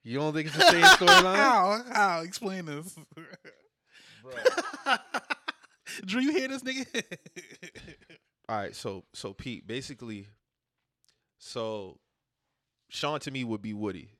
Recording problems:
uneven, jittery; strongly; from 4.5 to 13 s

